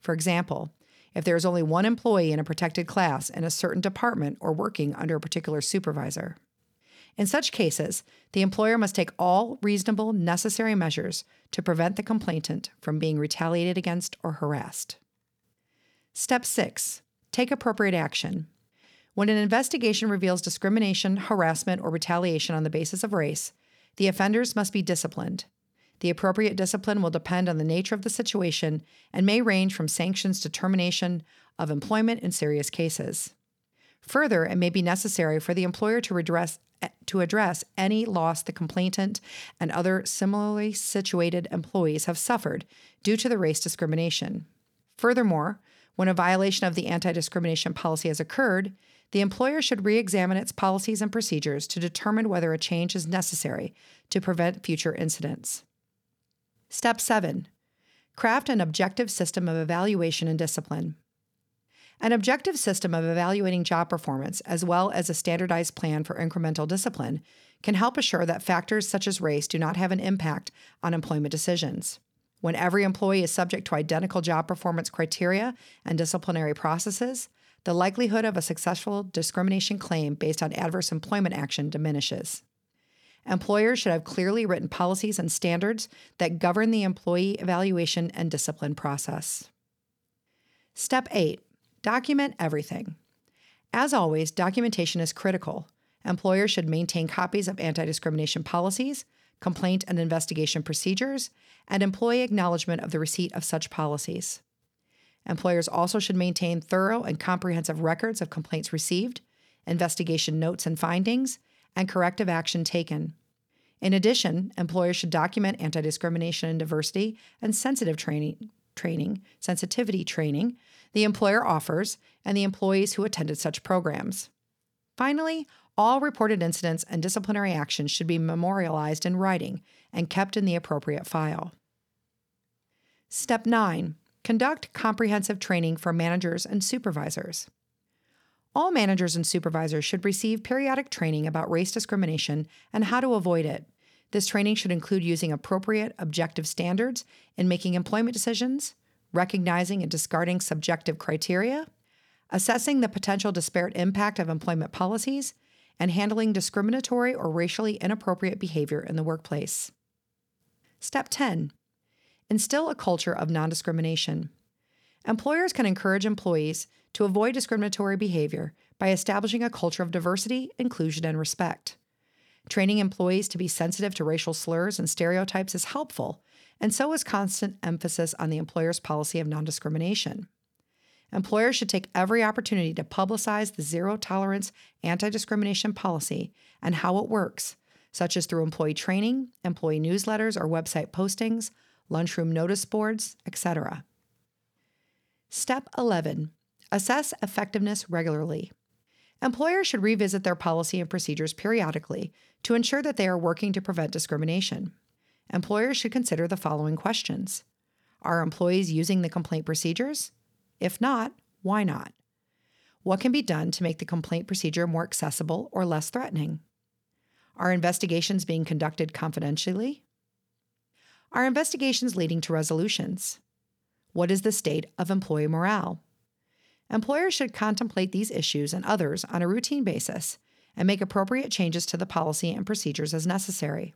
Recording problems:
none

